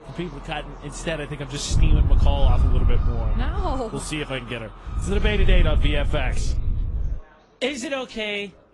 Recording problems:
garbled, watery; slightly; nothing above 10.5 kHz
animal sounds; noticeable; throughout; 15 dB below the speech
wind noise on the microphone; occasional gusts; from 1.5 to 4 s and from 5 to 7 s; 10 dB below the speech
chatter from many people; faint; throughout; 20 dB below the speech

